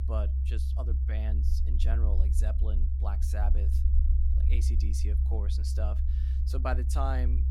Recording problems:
low rumble; loud; throughout; 6 dB below the speech

